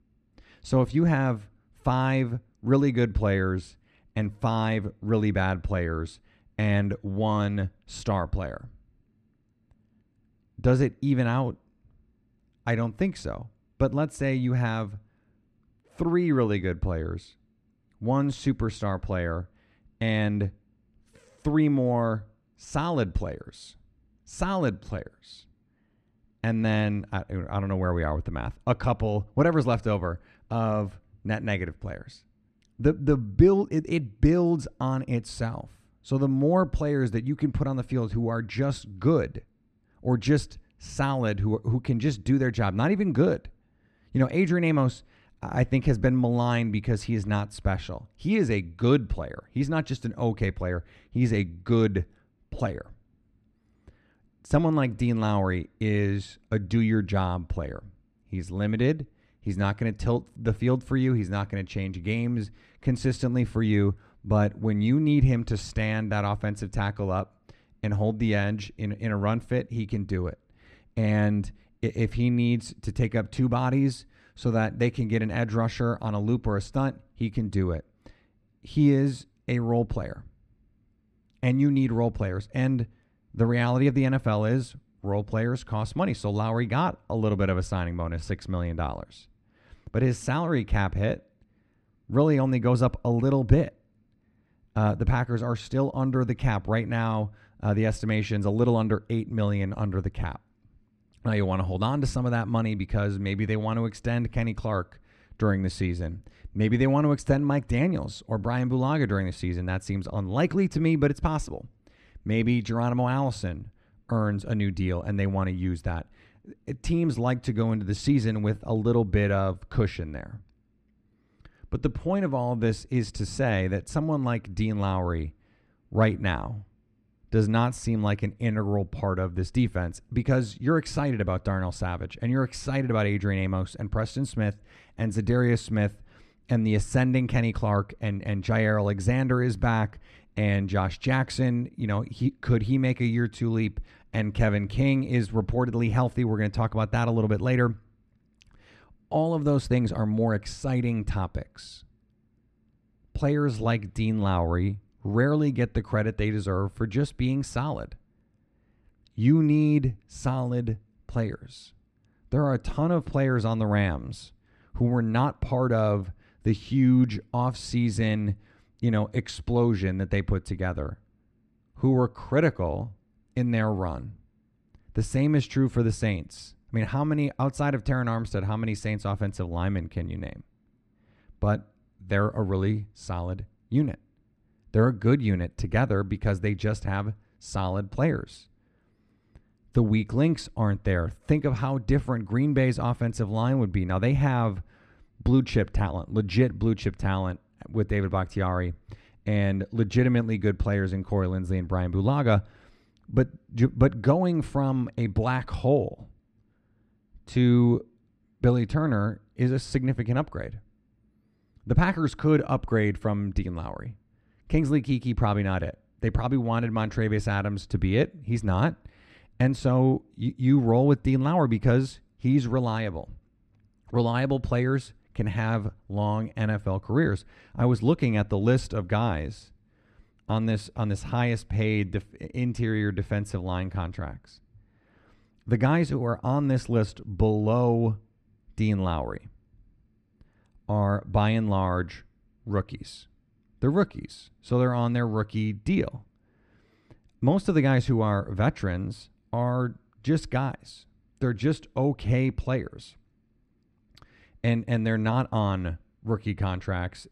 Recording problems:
muffled; slightly; fading above 2 kHz

